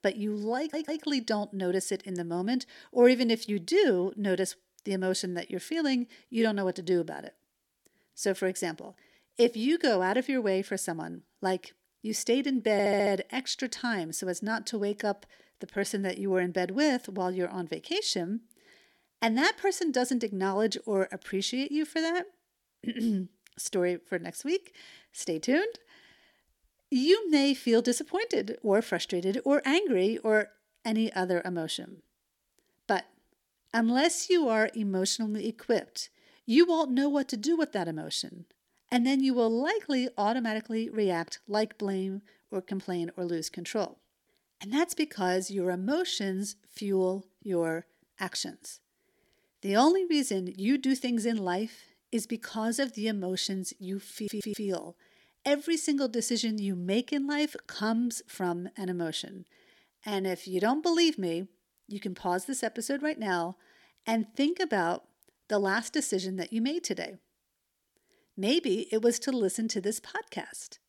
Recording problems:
audio stuttering; at 0.5 s, at 13 s and at 54 s

